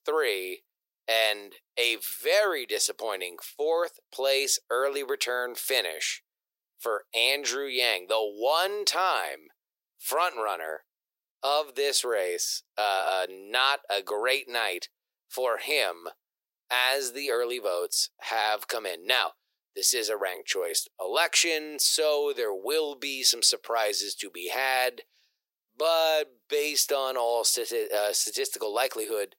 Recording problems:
thin; very; fading below 400 Hz

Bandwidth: 16 kHz